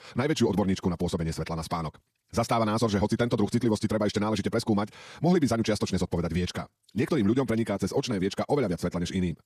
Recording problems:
wrong speed, natural pitch; too fast; 1.7 times normal speed

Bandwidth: 14.5 kHz